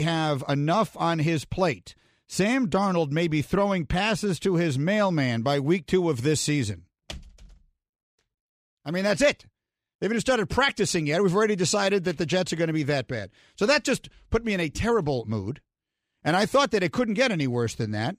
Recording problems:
abrupt cut into speech; at the start

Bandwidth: 14.5 kHz